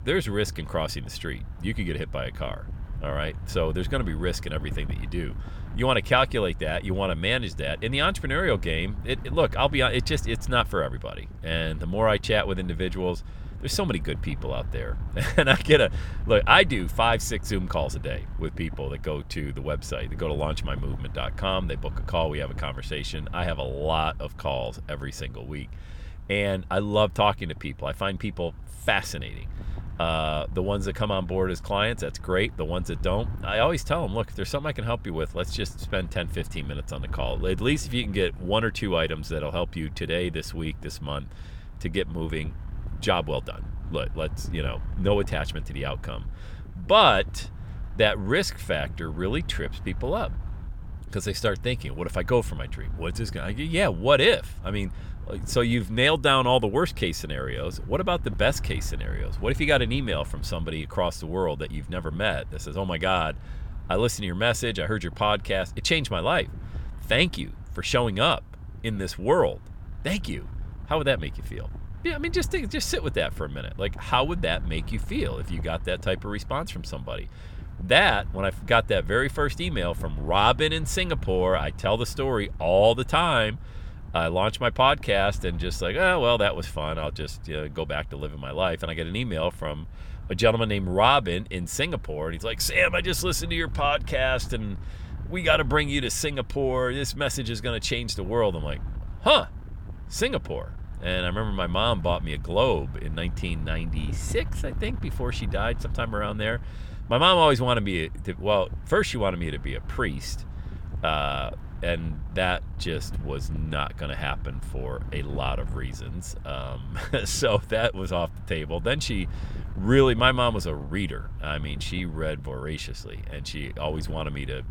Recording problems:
wind noise on the microphone; occasional gusts; 25 dB below the speech

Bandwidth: 17 kHz